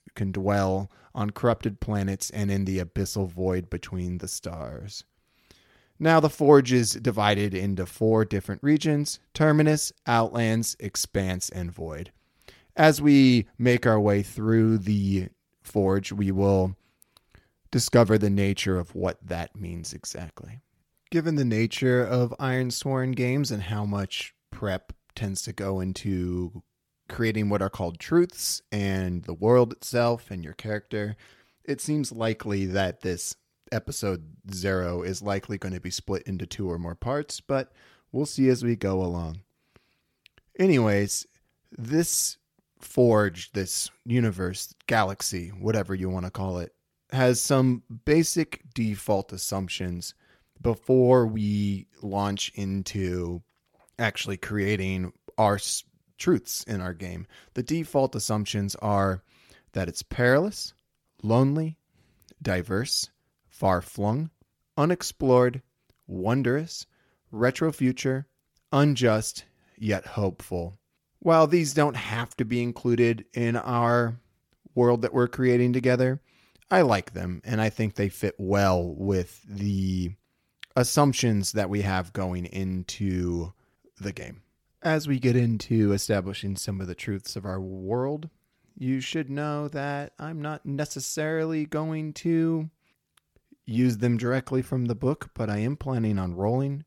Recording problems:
none

